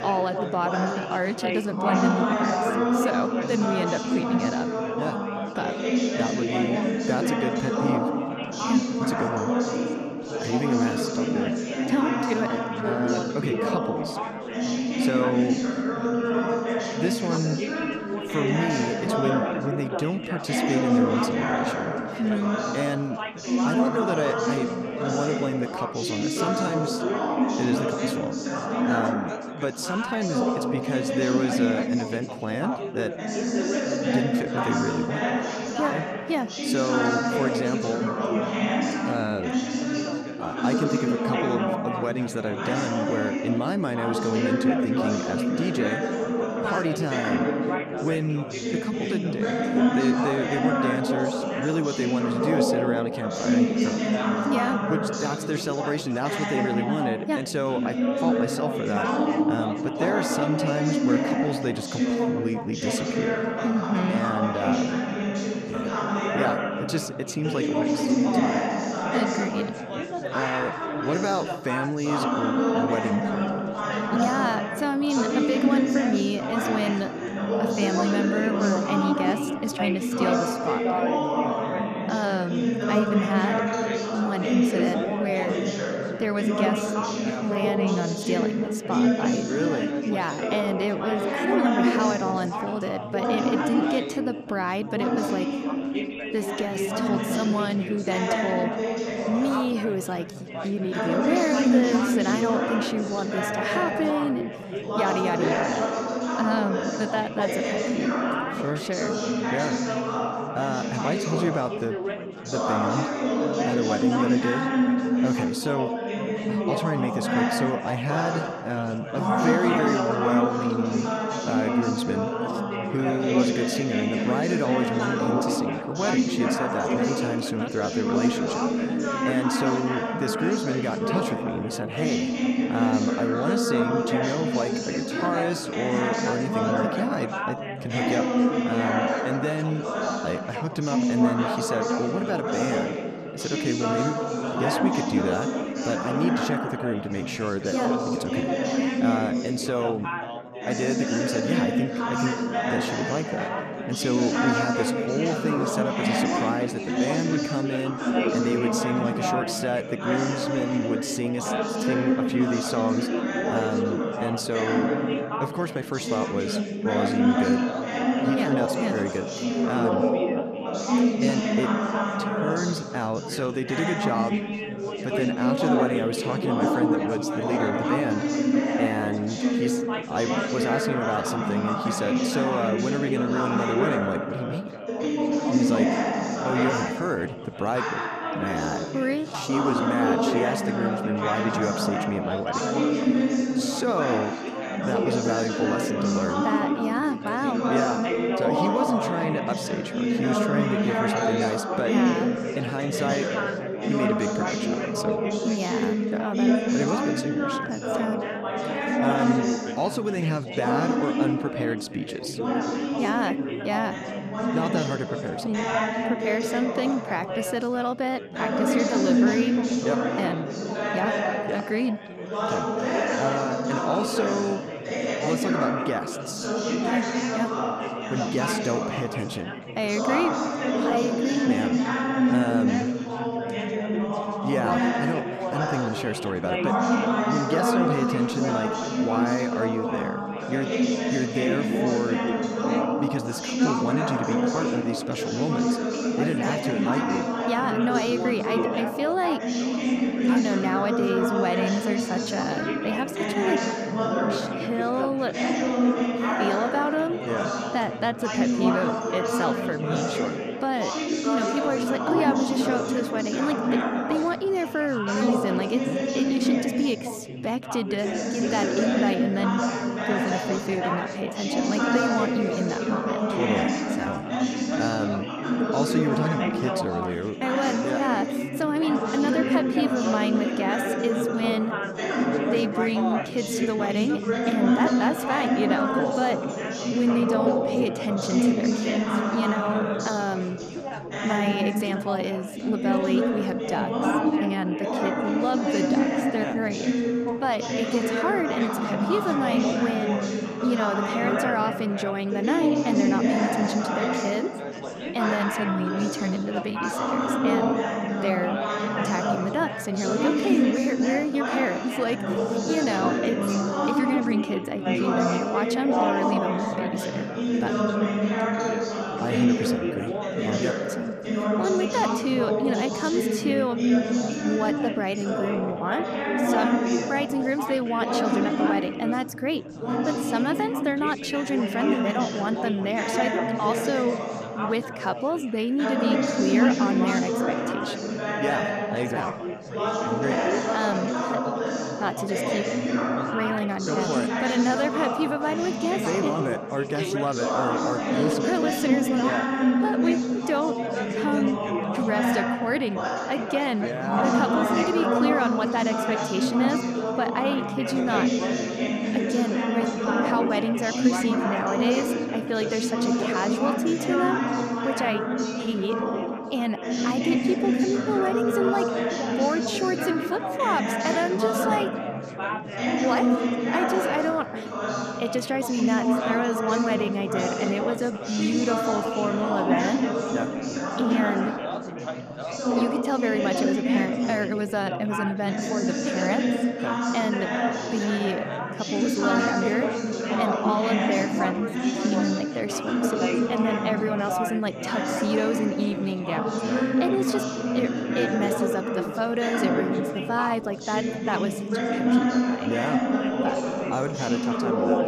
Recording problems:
chatter from many people; very loud; throughout; 3 dB above the speech

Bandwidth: 14.5 kHz